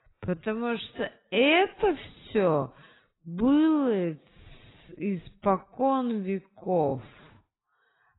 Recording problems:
garbled, watery; badly; nothing above 3.5 kHz
wrong speed, natural pitch; too slow; 0.5 times normal speed

